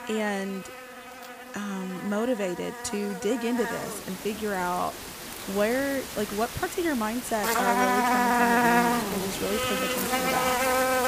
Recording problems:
animal sounds; very loud; throughout; 3 dB above the speech

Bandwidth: 15 kHz